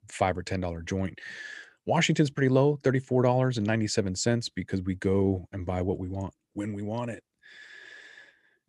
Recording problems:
none

